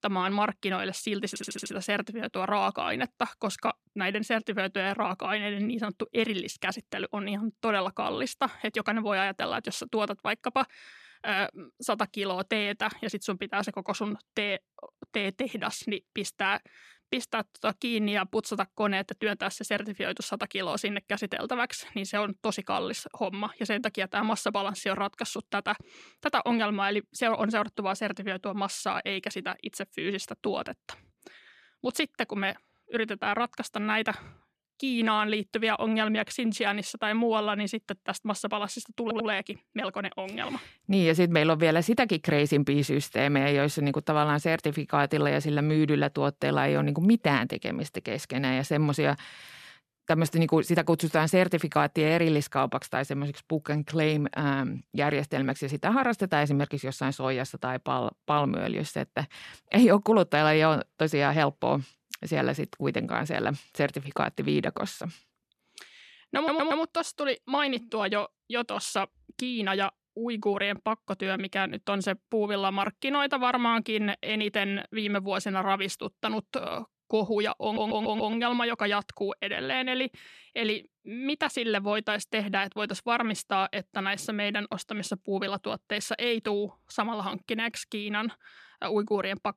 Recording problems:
audio stuttering; 4 times, first at 1.5 s

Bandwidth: 14 kHz